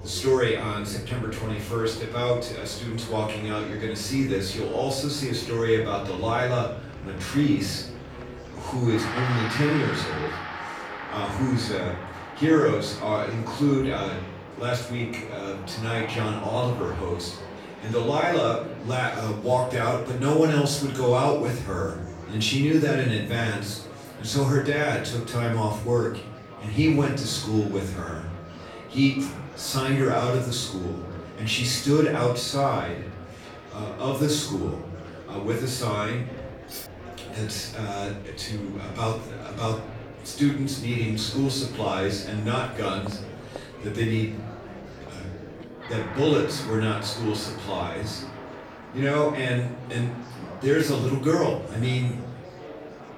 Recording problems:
off-mic speech; far
room echo; noticeable; dies away in 0.5 s
background music; noticeable; throughout; 15 dB below the speech
murmuring crowd; noticeable; throughout; 15 dB below the speech
clattering dishes; faint; at 37 s; peak 10 dB below the speech

